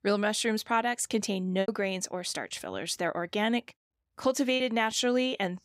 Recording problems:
choppy; occasionally; at 1.5 s and at 4.5 s; 4% of the speech affected

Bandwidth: 15.5 kHz